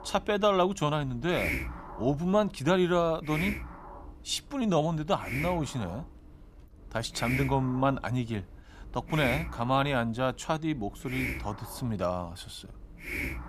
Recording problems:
hiss; loud; throughout; 8 dB below the speech

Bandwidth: 14.5 kHz